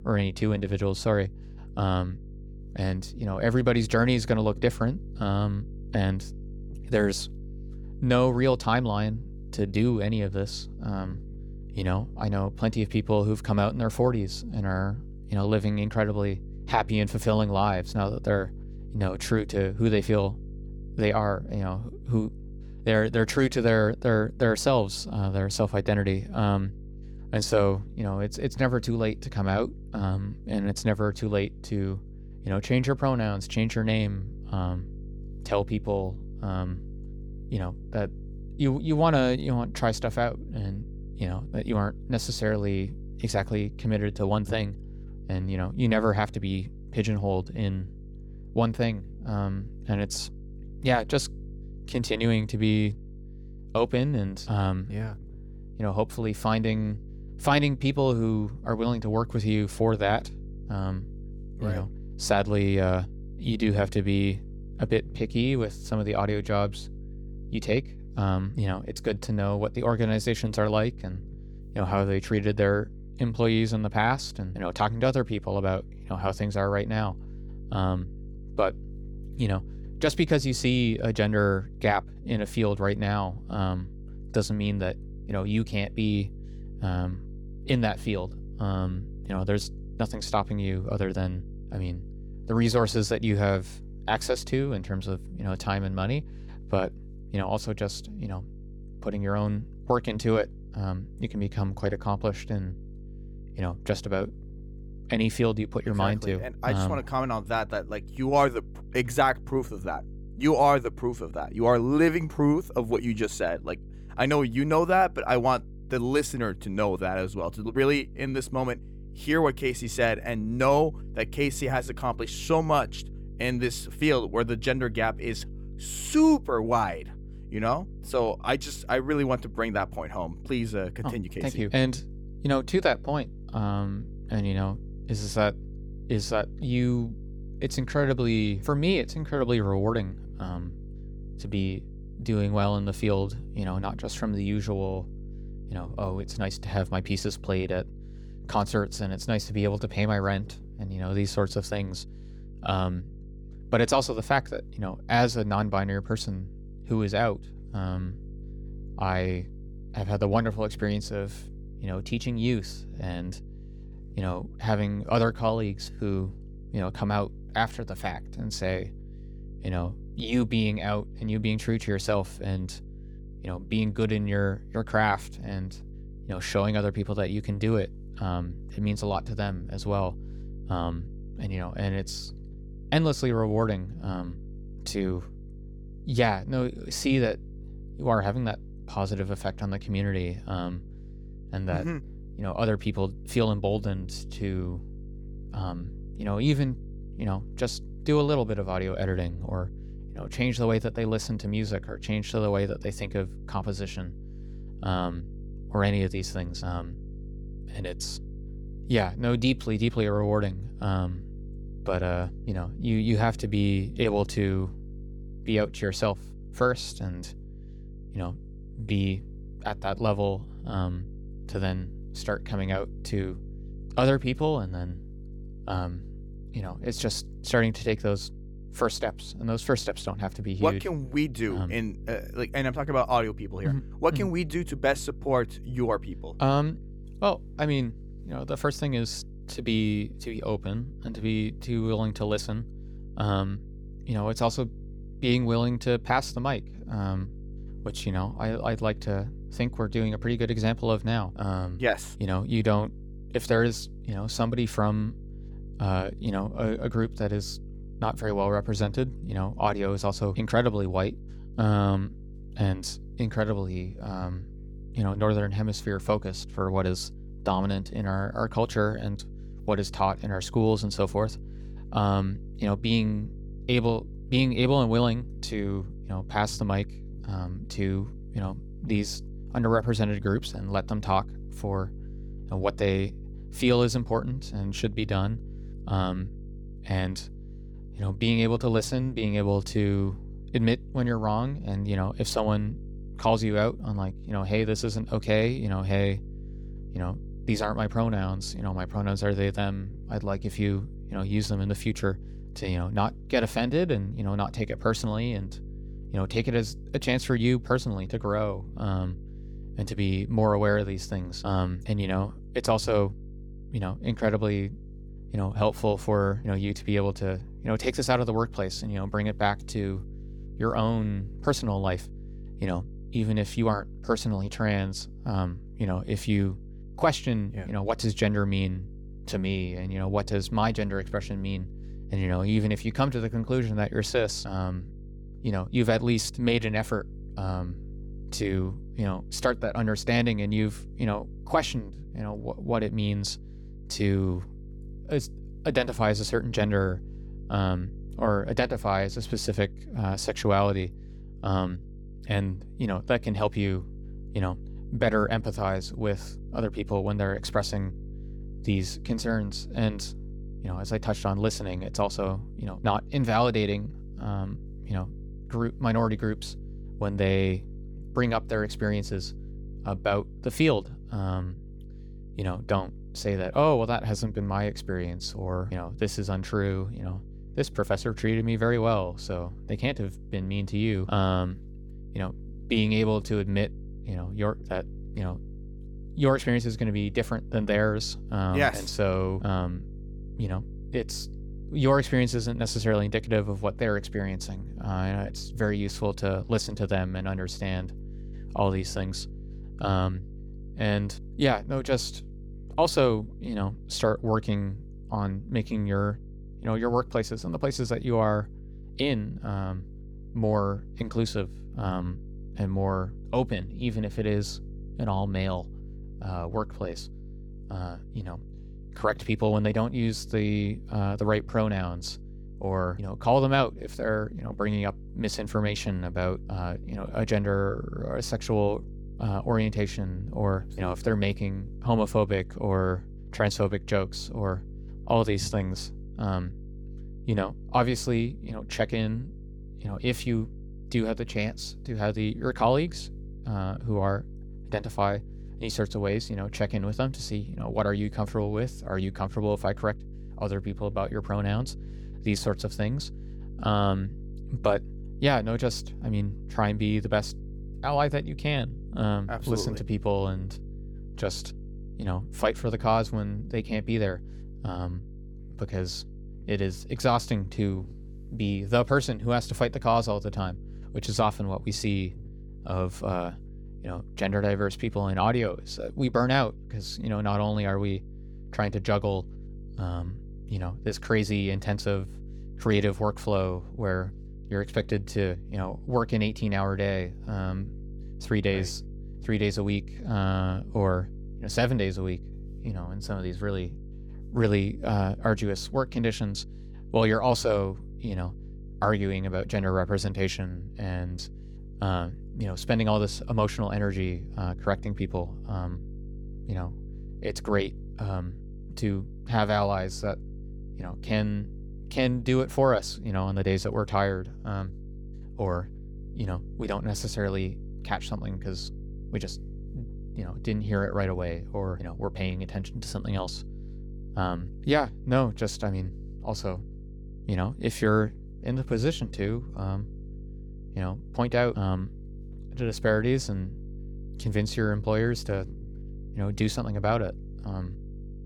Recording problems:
electrical hum; faint; throughout; 50 Hz, 25 dB below the speech

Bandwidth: 18.5 kHz